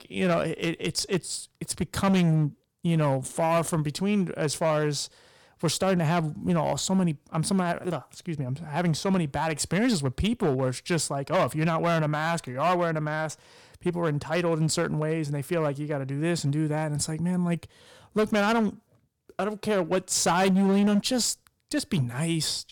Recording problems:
distortion; slight; 6% of the sound clipped

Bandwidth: 18.5 kHz